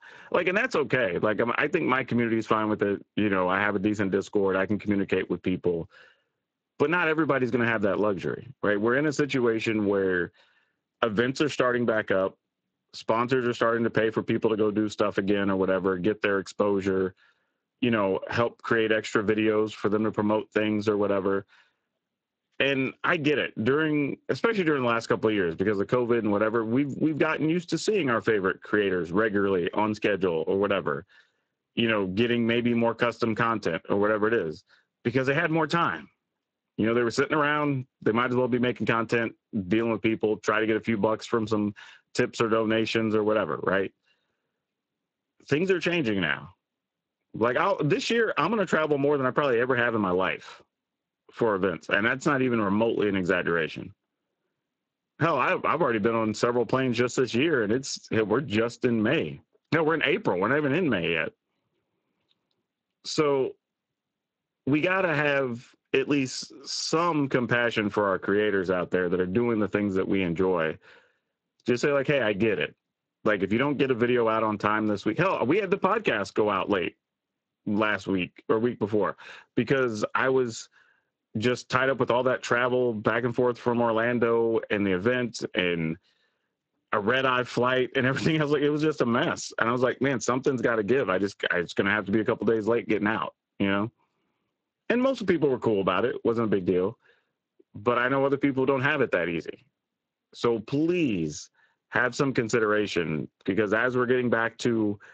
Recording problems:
garbled, watery; slightly; nothing above 7.5 kHz
squashed, flat; somewhat

